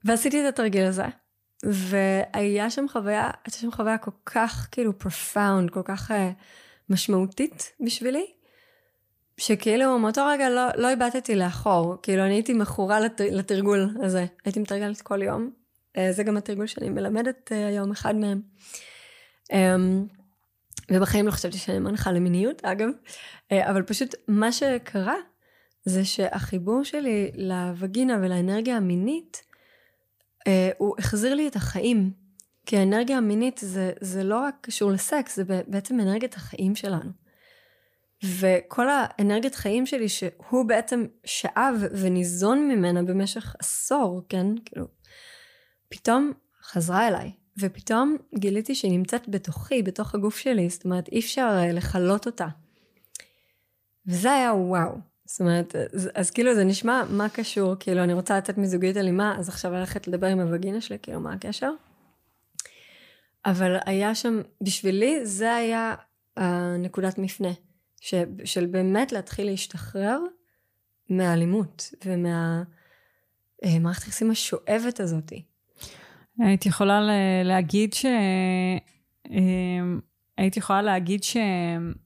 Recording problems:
none

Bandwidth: 15 kHz